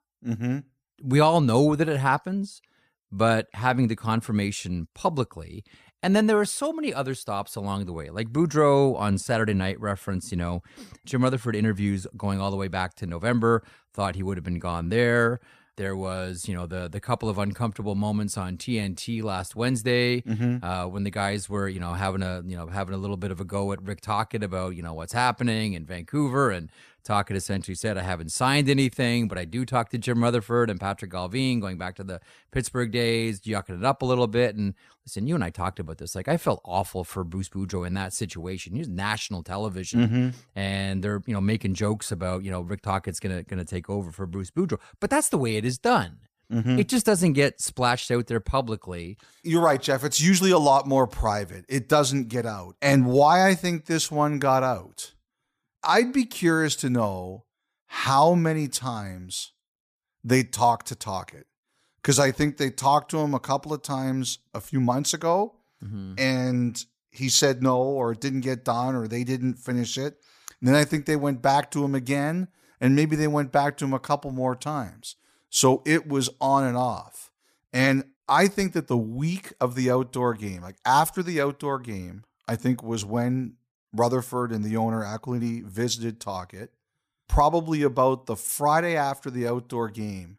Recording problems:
none

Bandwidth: 15 kHz